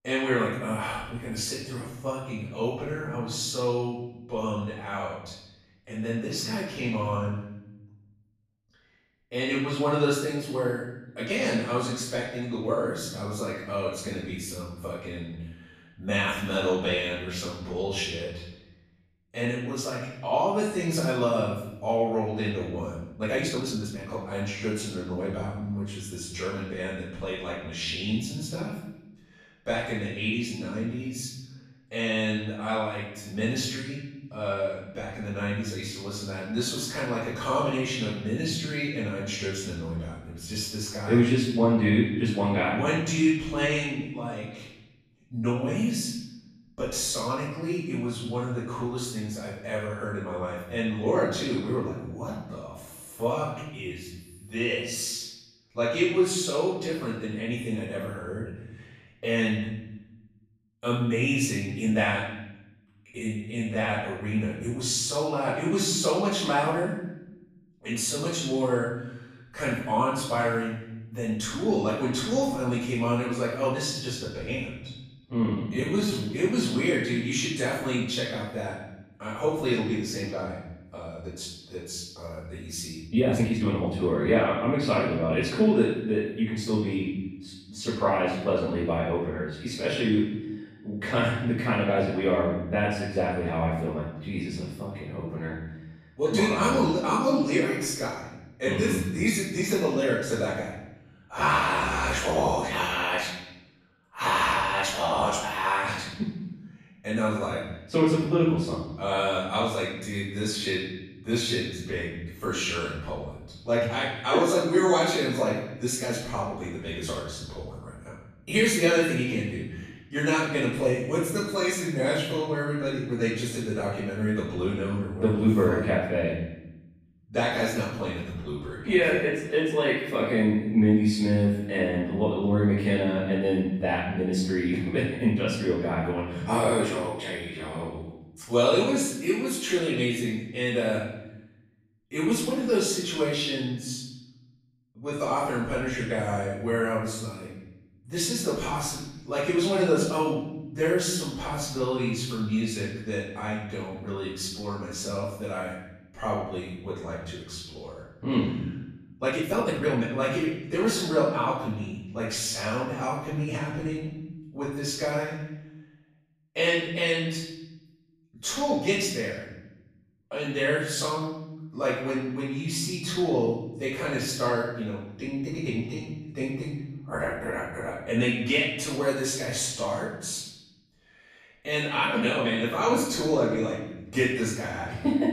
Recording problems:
off-mic speech; far
room echo; noticeable; dies away in 1 s
uneven, jittery; strongly; from 23 s to 2:40

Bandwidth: 14.5 kHz